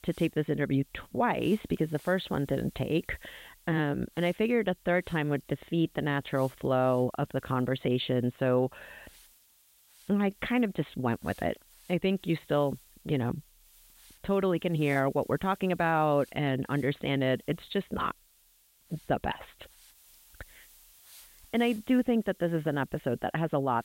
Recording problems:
high frequencies cut off; severe; nothing above 4 kHz
hiss; faint; throughout; 25 dB below the speech

